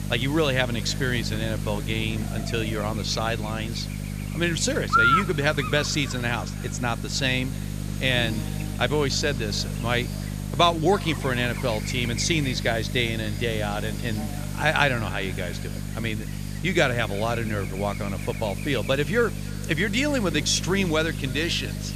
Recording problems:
echo of what is said; faint; throughout; 300 ms later, 25 dB below the speech
electrical hum; loud; throughout; 50 Hz, 7 dB below the speech
hiss; noticeable; throughout; 20 dB below the speech

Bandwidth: 14.5 kHz